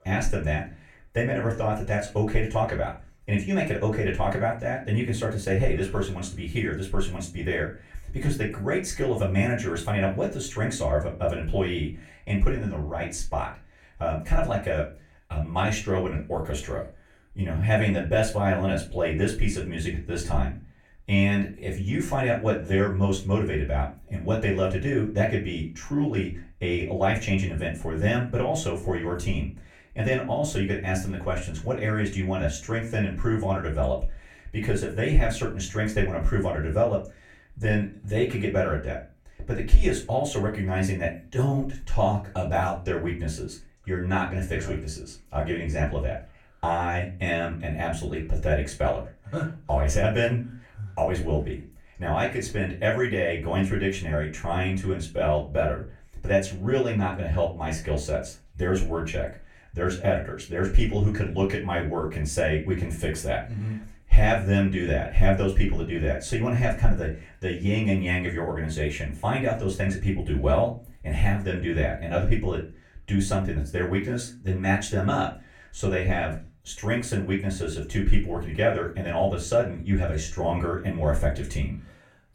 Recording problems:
off-mic speech; far
room echo; very slight; dies away in 0.3 s

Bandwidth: 17 kHz